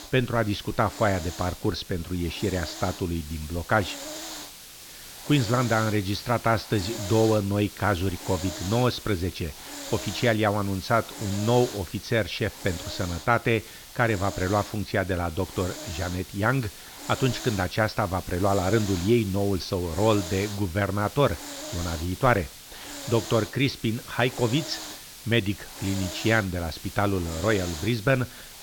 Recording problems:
high frequencies cut off; noticeable; nothing above 6 kHz
hiss; noticeable; throughout; 10 dB below the speech

